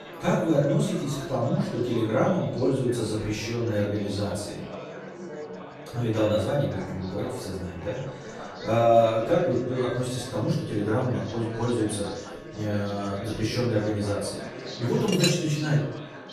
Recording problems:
off-mic speech; far
room echo; noticeable; dies away in 0.6 s
chatter from many people; noticeable; throughout; 15 dB below the speech
background music; faint; throughout; 25 dB below the speech
clattering dishes; noticeable; at 15 s; peak 1 dB below the speech

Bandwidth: 14.5 kHz